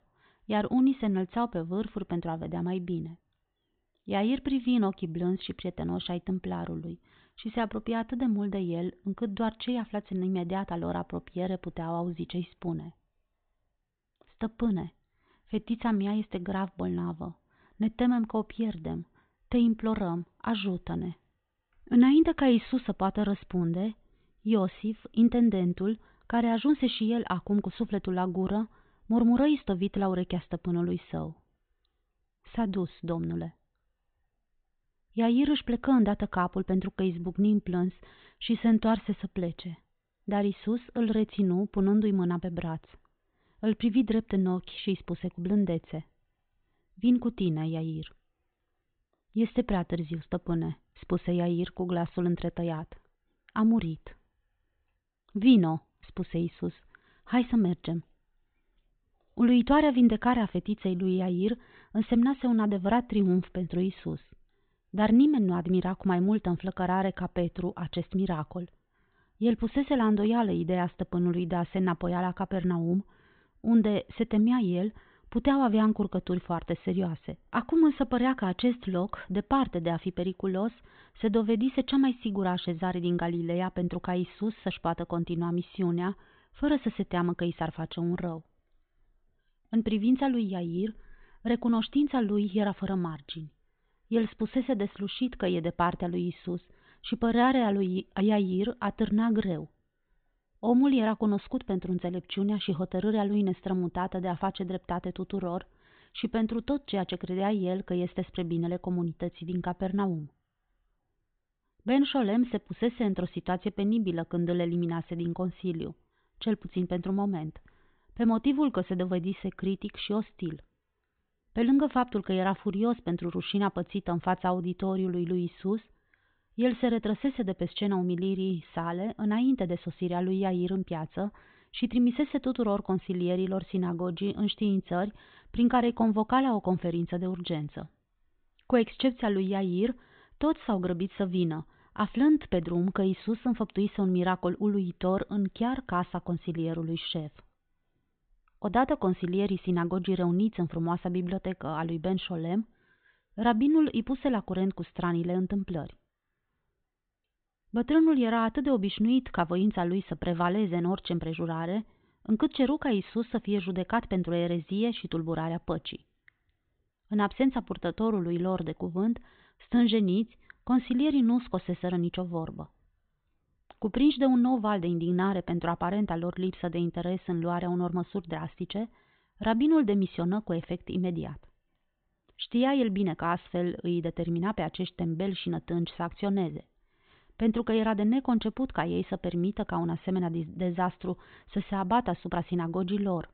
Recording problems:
high frequencies cut off; severe; nothing above 4 kHz

